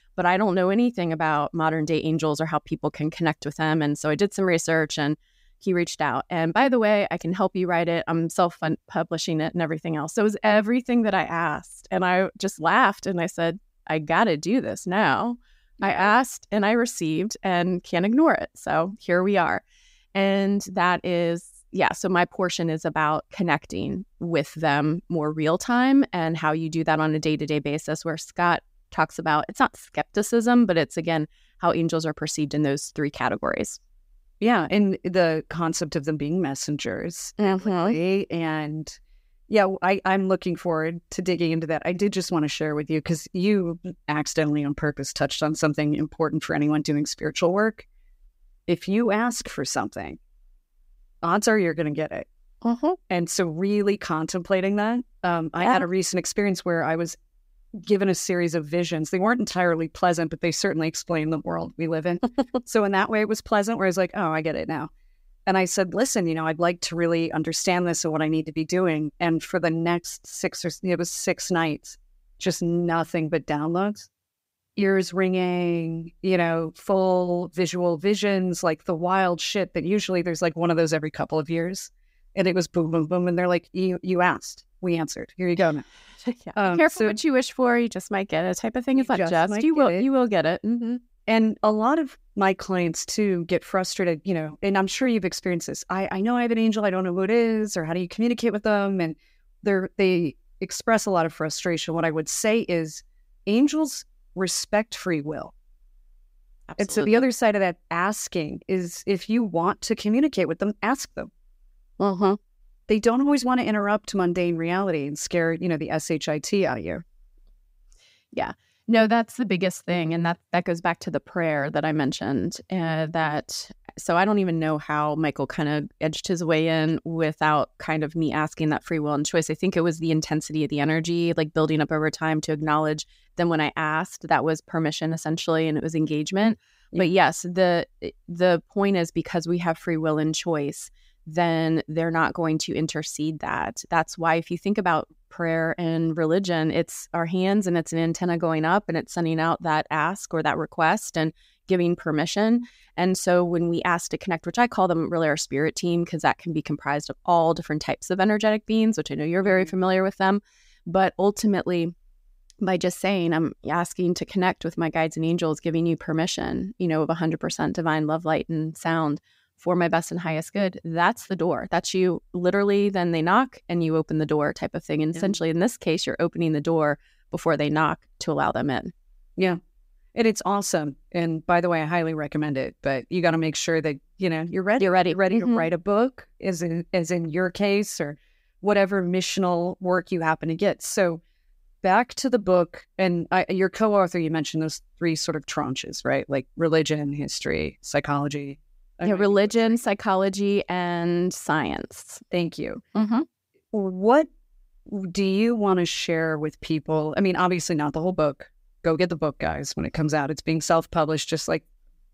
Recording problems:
none

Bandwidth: 15.5 kHz